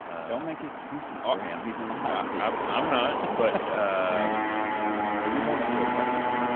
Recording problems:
phone-call audio; nothing above 3.5 kHz
traffic noise; very loud; throughout; 1 dB above the speech

